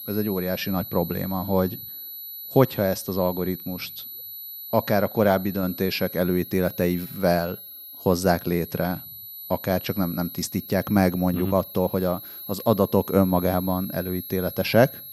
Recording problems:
high-pitched whine; noticeable; throughout; 12 kHz, 10 dB below the speech

